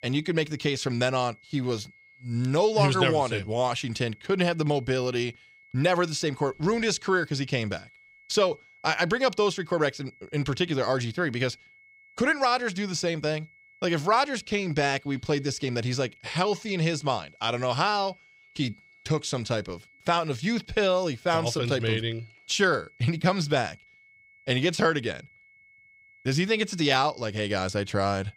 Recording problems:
high-pitched whine; faint; throughout; 2 kHz, 30 dB below the speech

